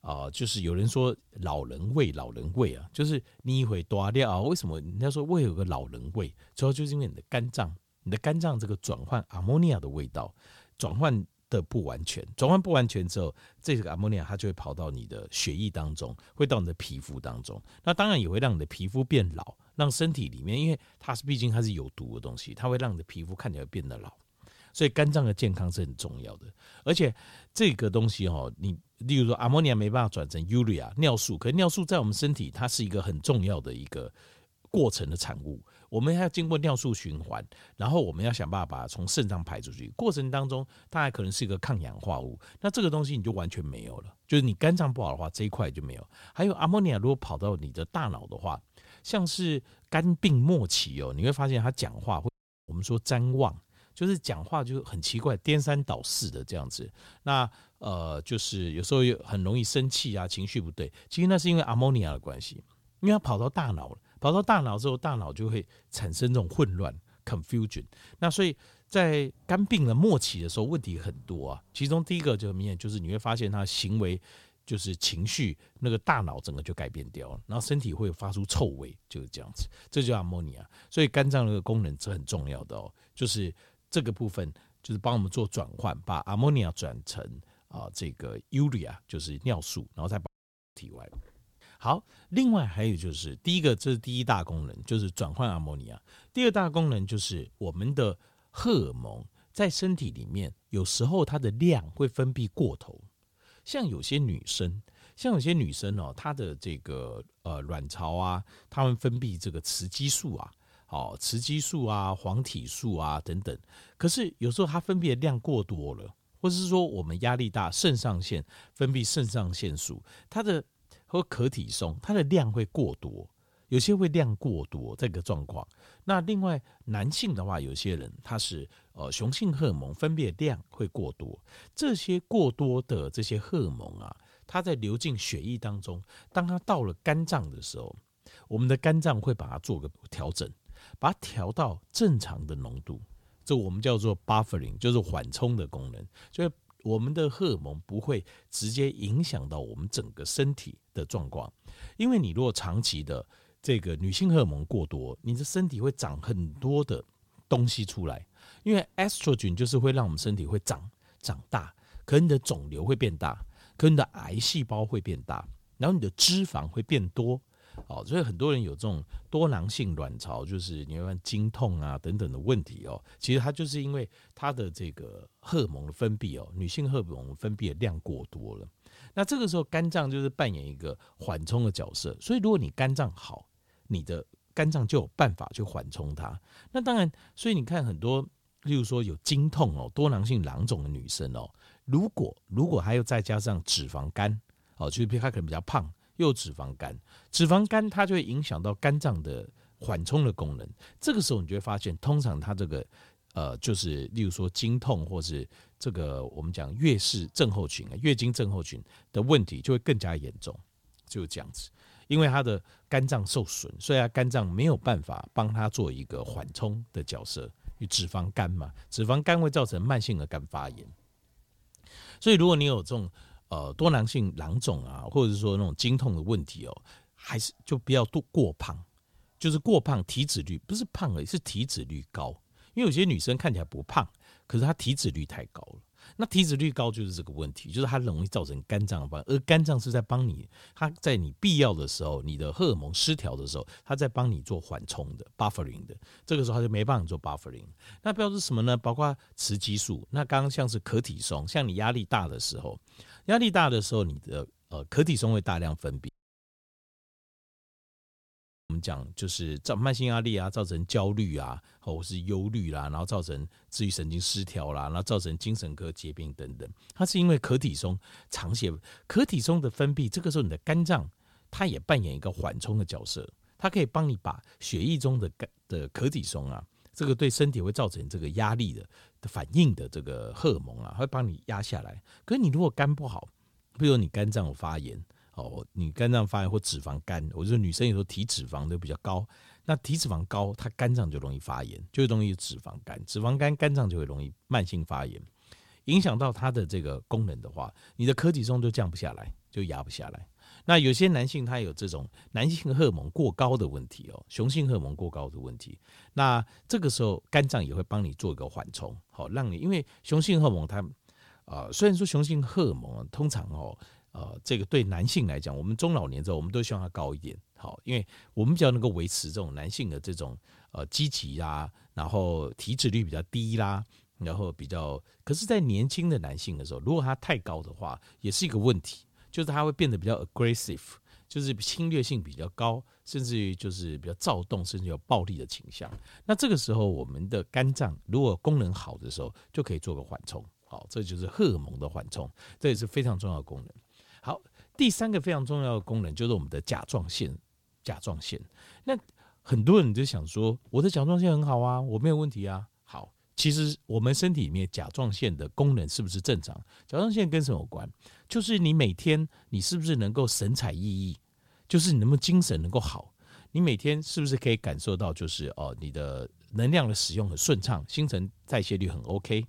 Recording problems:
audio cutting out; at 52 s, at 1:30 and at 4:16 for 2.5 s

